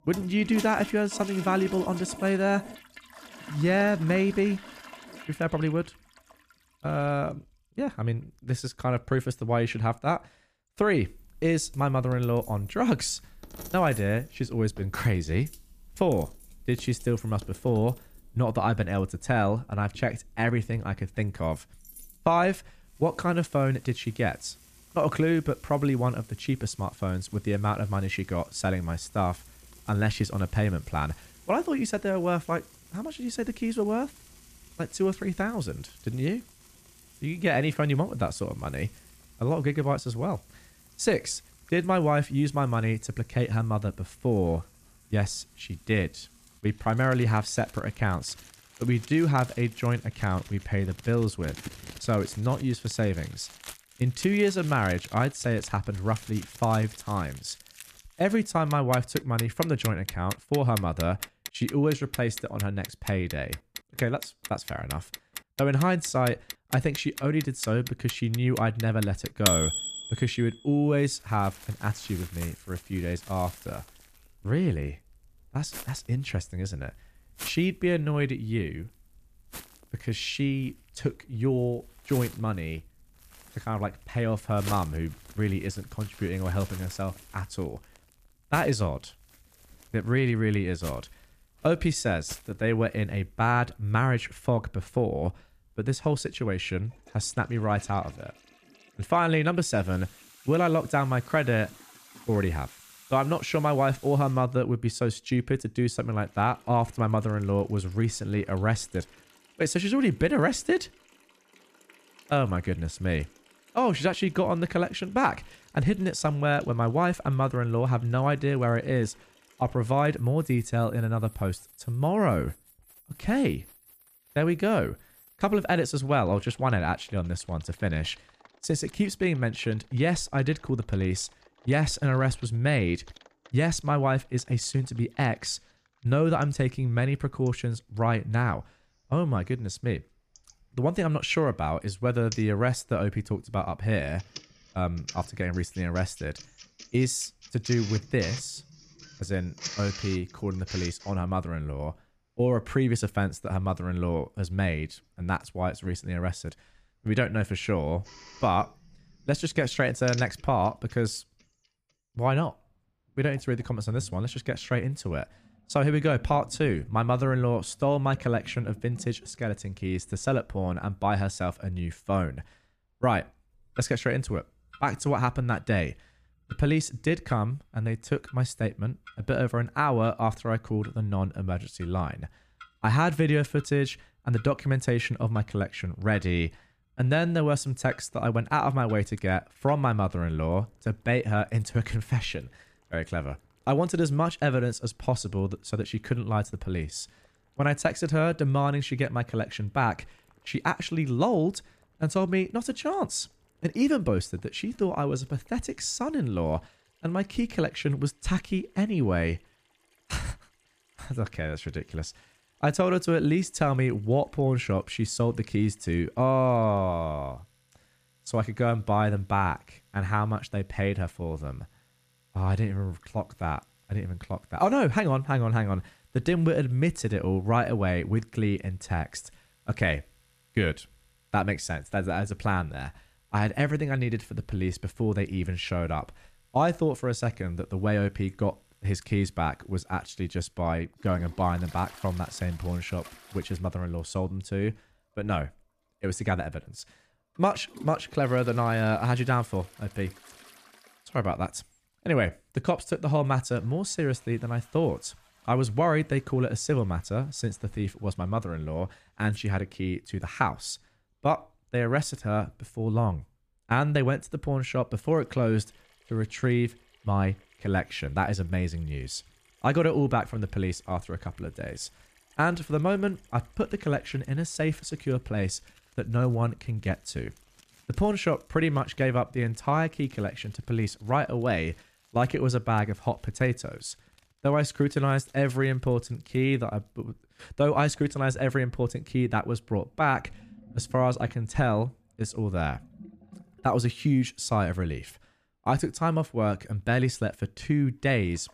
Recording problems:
household noises; noticeable; throughout; 15 dB below the speech

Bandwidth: 14.5 kHz